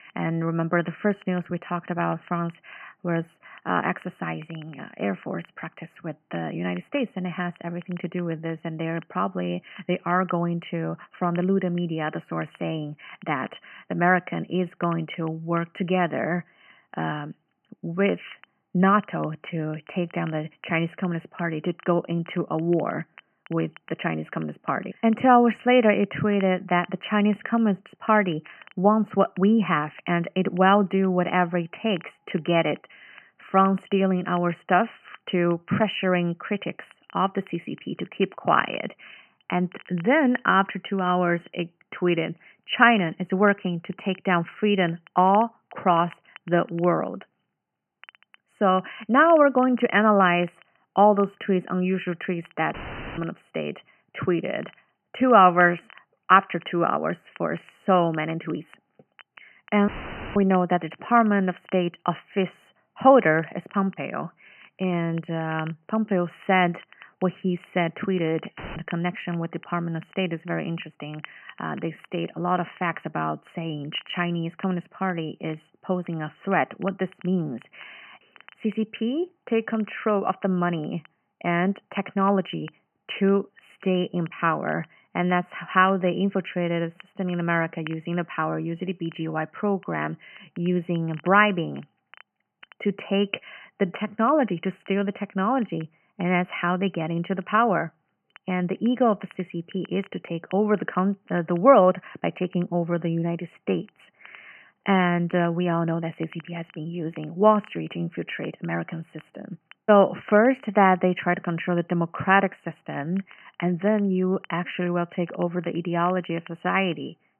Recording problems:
high frequencies cut off; severe; nothing above 3 kHz
crackle, like an old record; faint; 25 dB below the speech
audio cutting out; filled with static; at 53 s, at 1:00 and at 1:09

